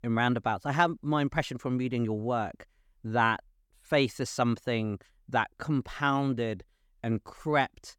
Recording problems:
none

